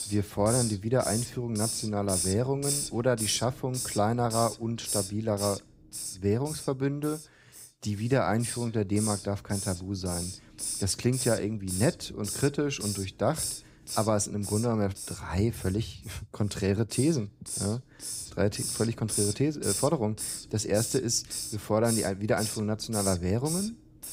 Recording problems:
hiss; loud; throughout; 5 dB below the speech

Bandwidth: 15.5 kHz